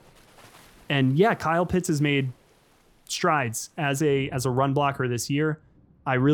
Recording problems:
rain or running water; faint; throughout; 30 dB below the speech
abrupt cut into speech; at the end

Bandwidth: 17.5 kHz